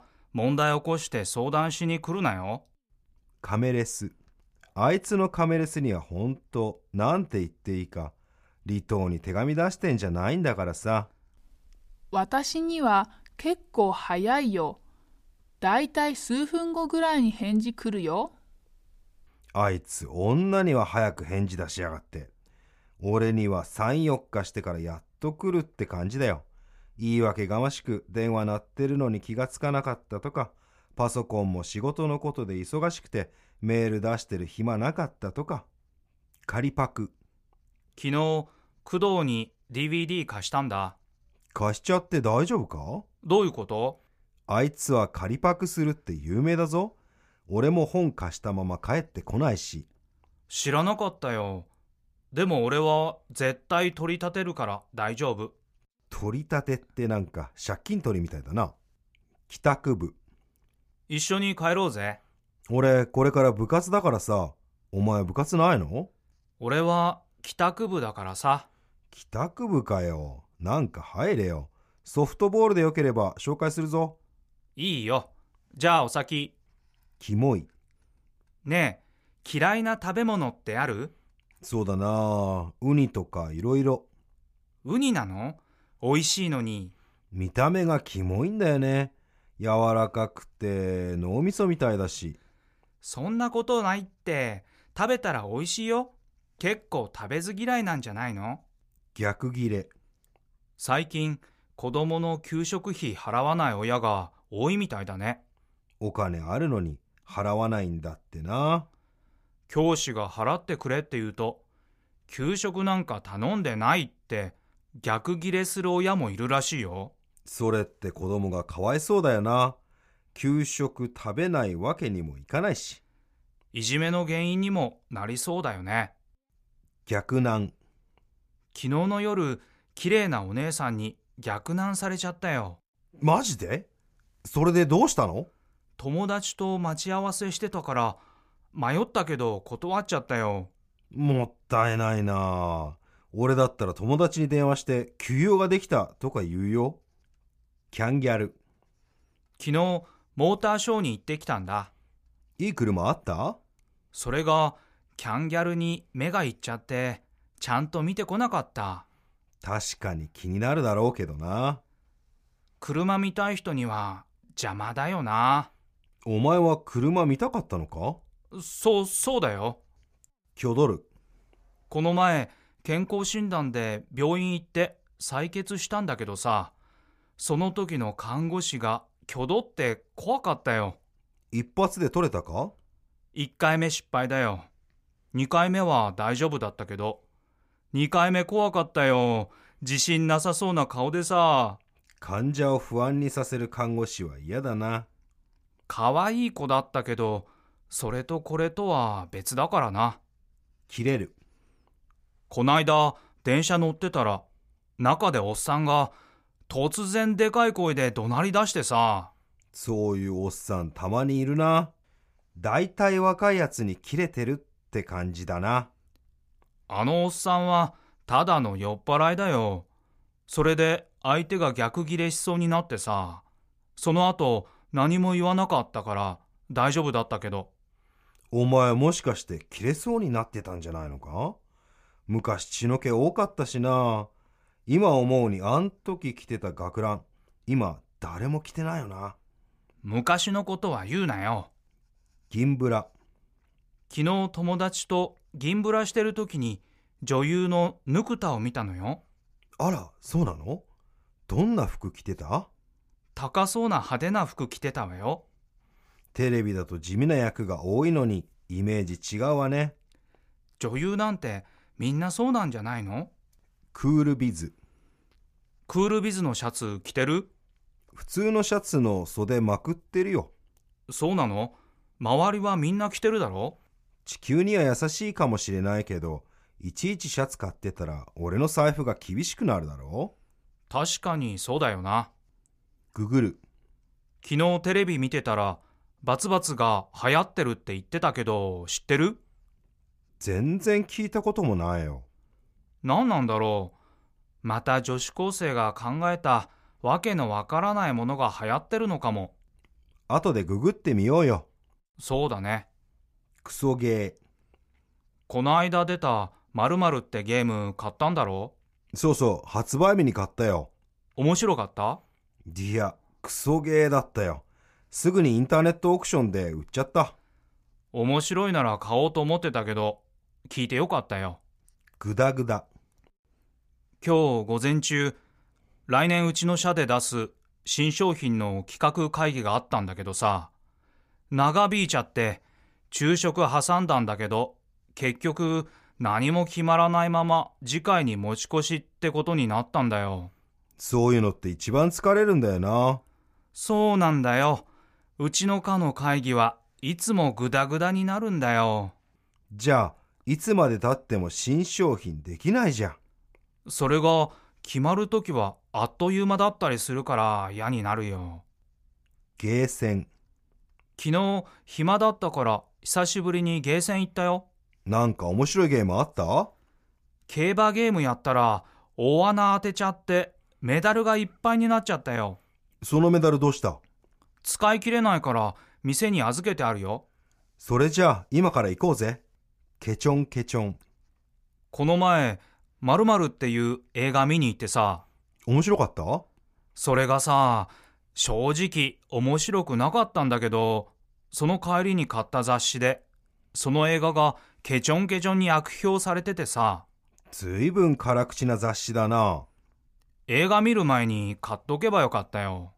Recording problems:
none

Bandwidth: 15 kHz